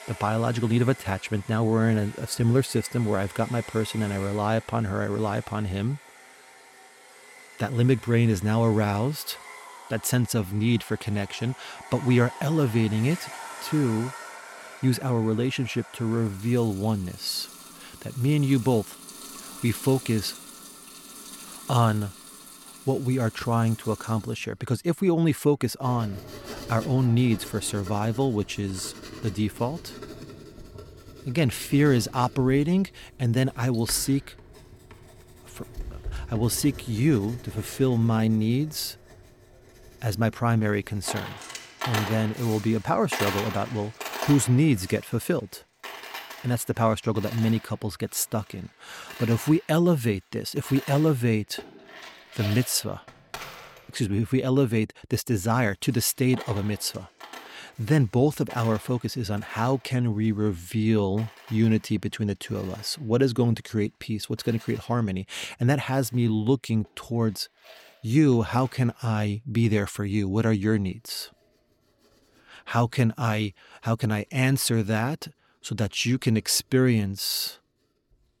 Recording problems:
household noises; noticeable; throughout; 15 dB below the speech

